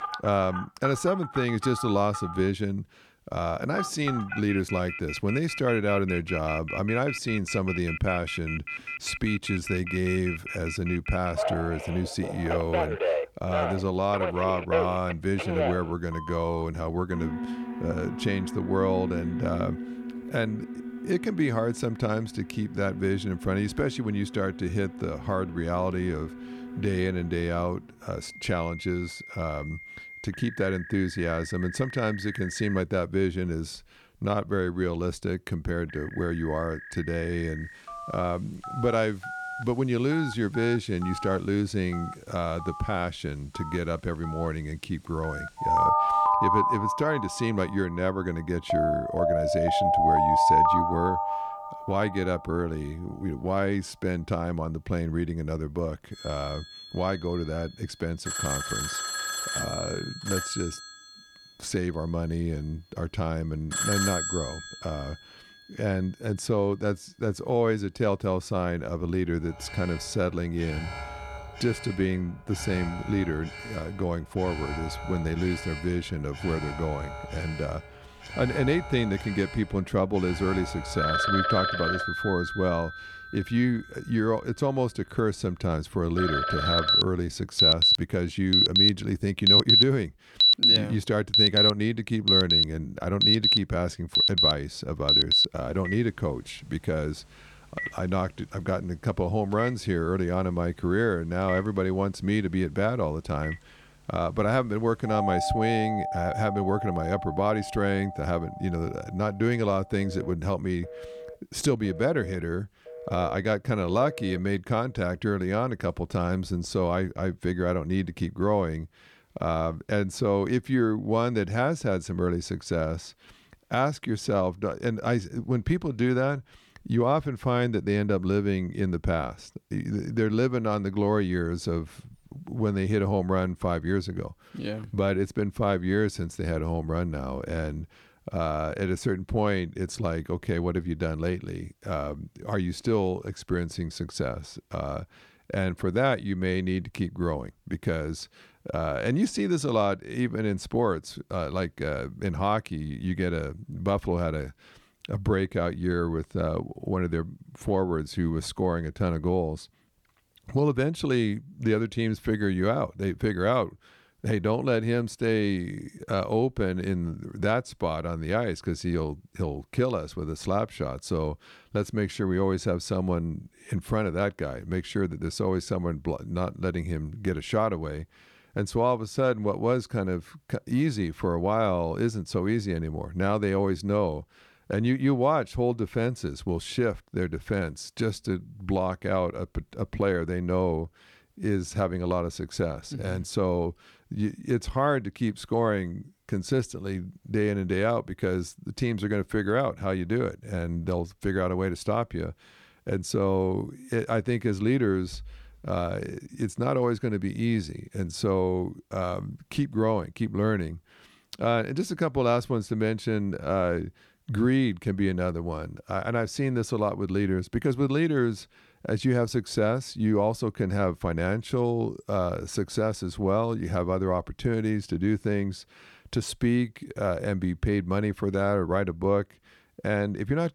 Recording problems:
alarms or sirens; very loud; until 1:55; 2 dB above the speech

